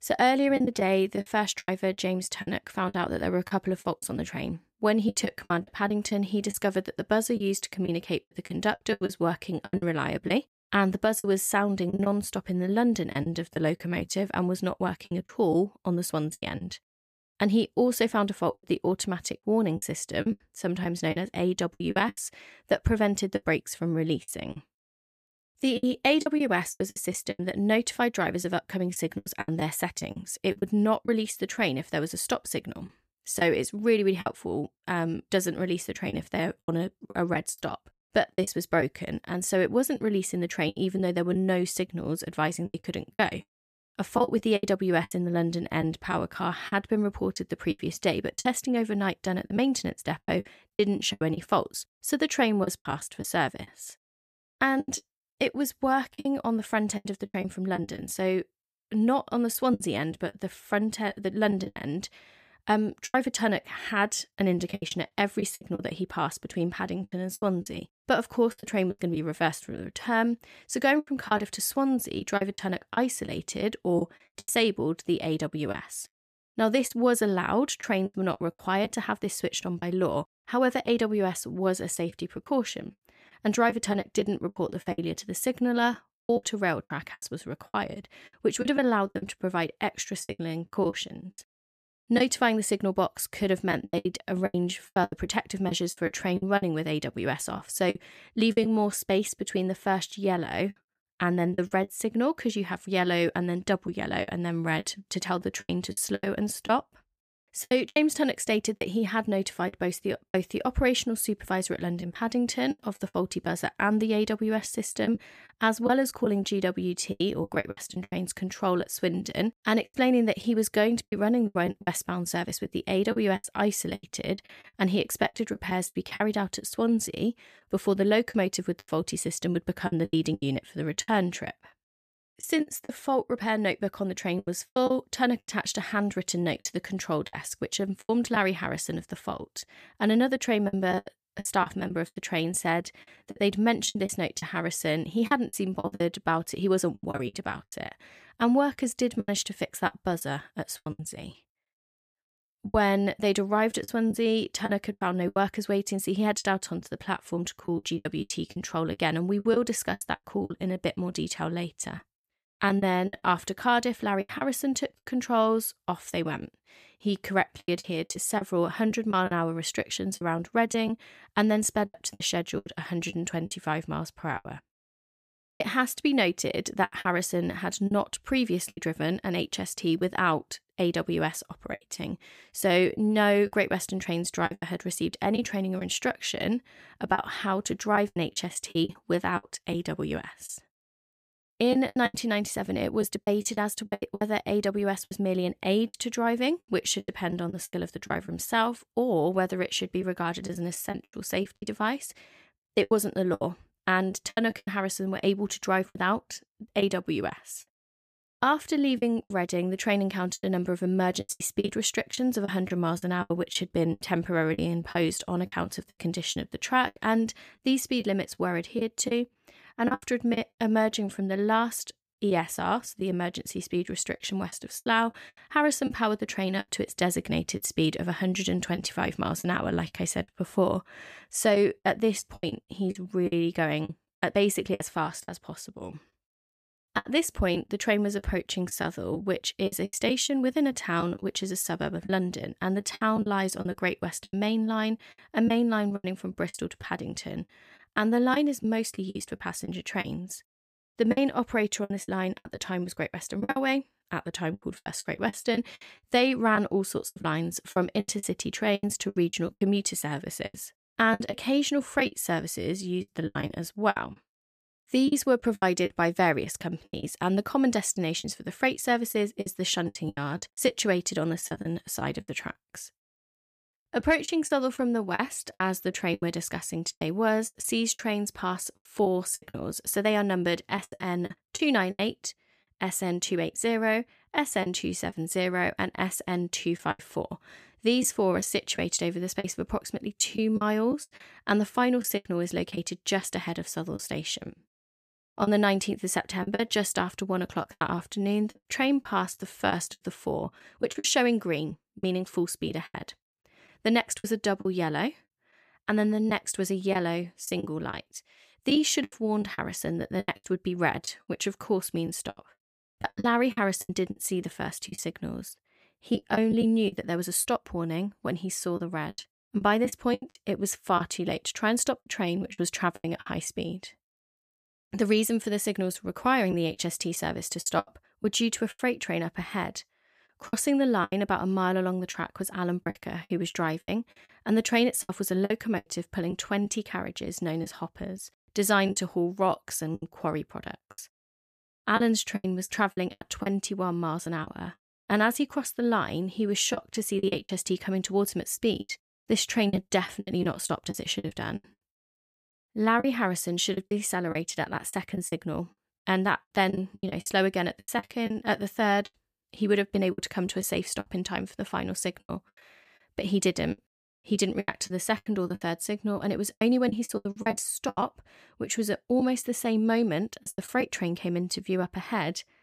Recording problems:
choppy; very; 10% of the speech affected

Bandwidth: 14.5 kHz